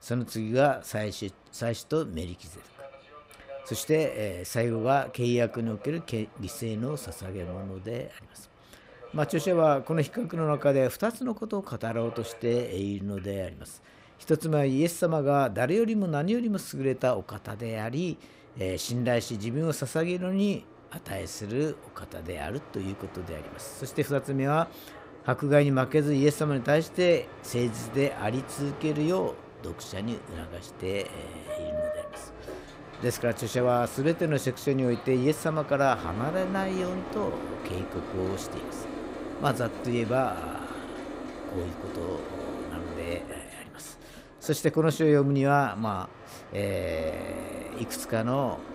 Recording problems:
train or aircraft noise; noticeable; throughout; 15 dB below the speech

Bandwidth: 15.5 kHz